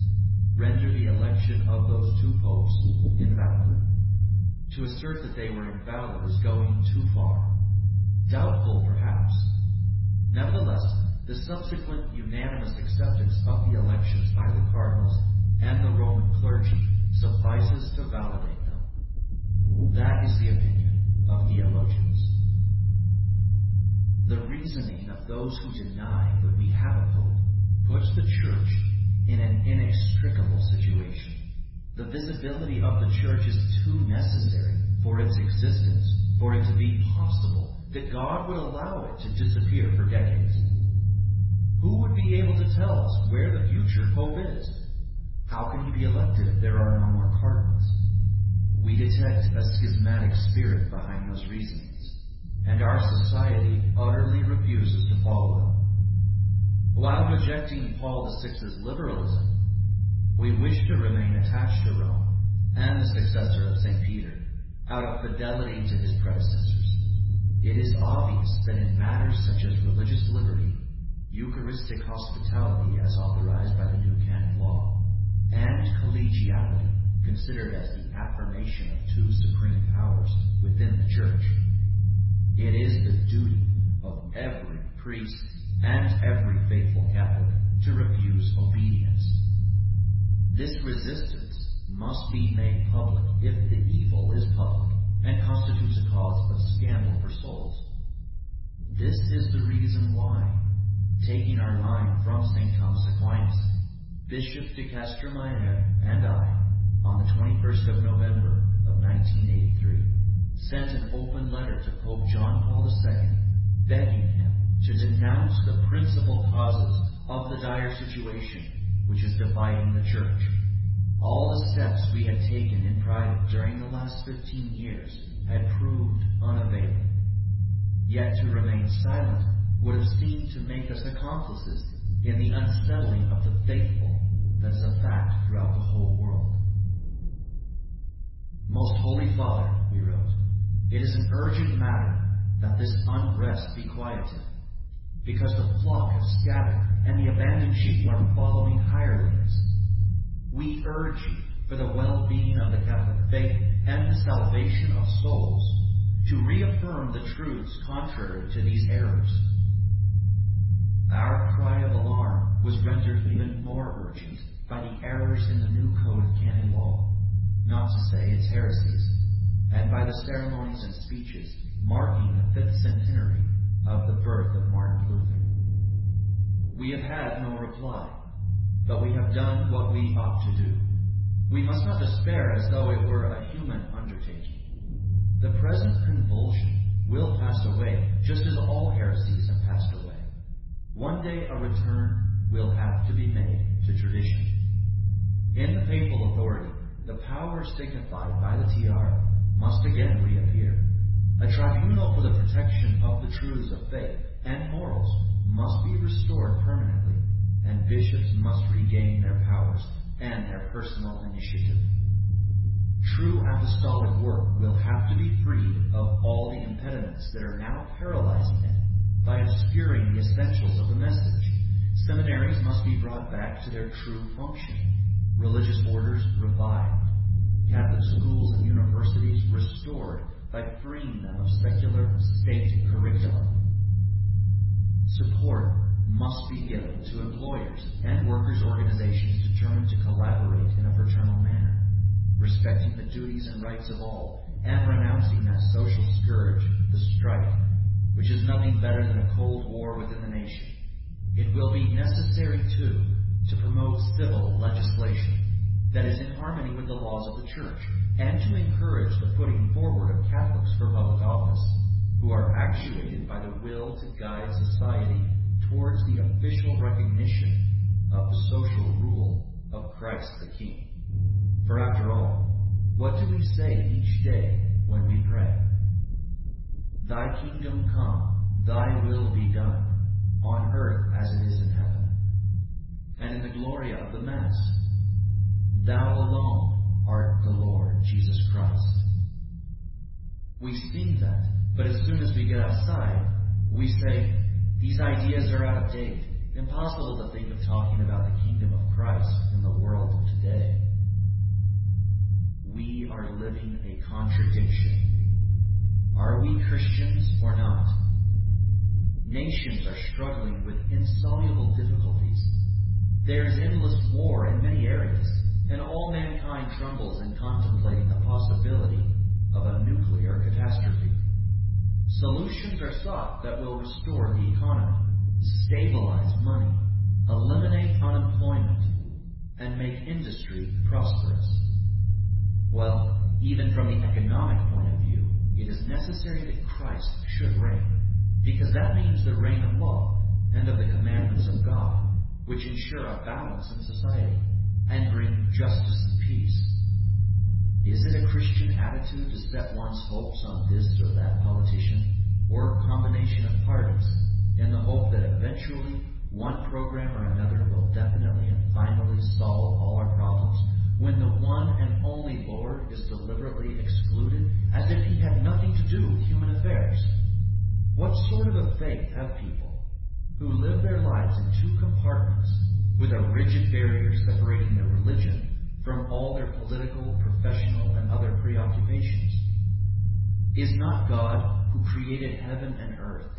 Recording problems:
garbled, watery; badly; nothing above 5.5 kHz
room echo; noticeable; dies away in 1 s
off-mic speech; somewhat distant
low rumble; loud; throughout; 1 dB below the speech
wind noise on the microphone; occasional gusts; 20 dB below the speech

